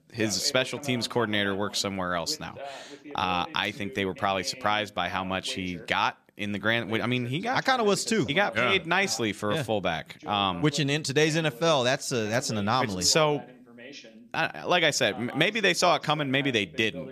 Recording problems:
voice in the background; noticeable; throughout; 20 dB below the speech

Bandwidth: 14.5 kHz